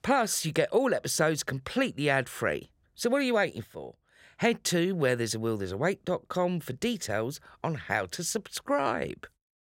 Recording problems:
none

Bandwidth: 16 kHz